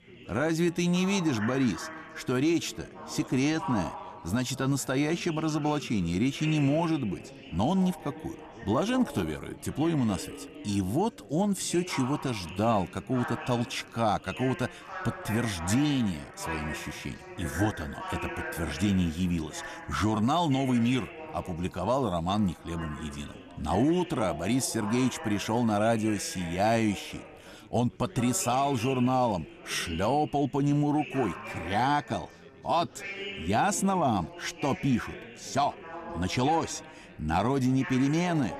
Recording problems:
background chatter; noticeable; throughout; 4 voices, 15 dB below the speech

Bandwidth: 14.5 kHz